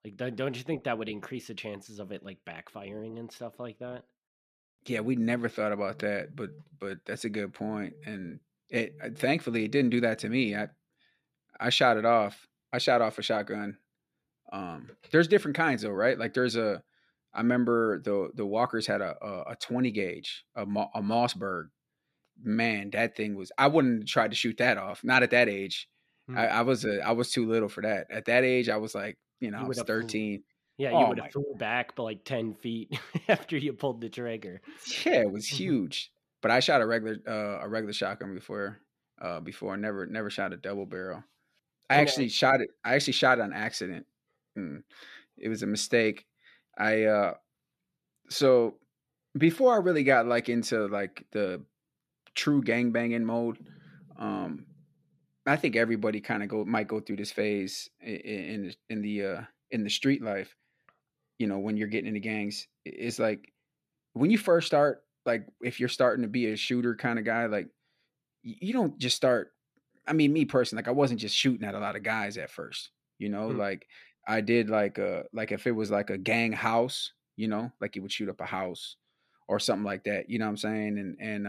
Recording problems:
abrupt cut into speech; at the end

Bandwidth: 15 kHz